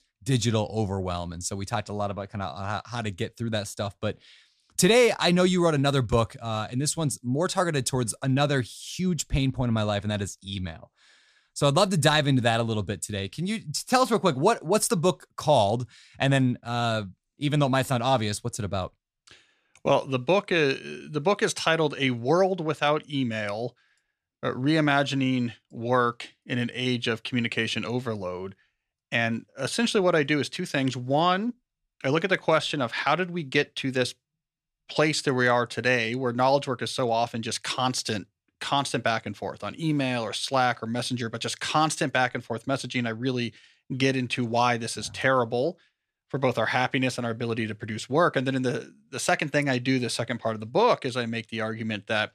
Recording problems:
none

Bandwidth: 14.5 kHz